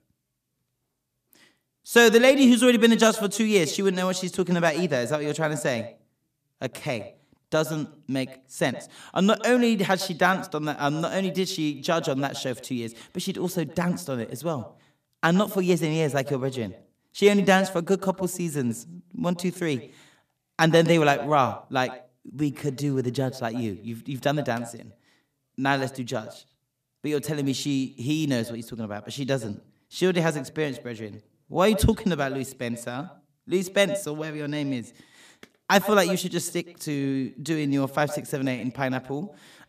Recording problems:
echo of what is said; noticeable; throughout; 110 ms later, 15 dB below the speech

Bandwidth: 14.5 kHz